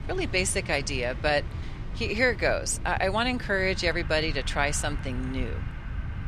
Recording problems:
train or aircraft noise; noticeable; throughout; 20 dB below the speech
low rumble; faint; throughout; 25 dB below the speech

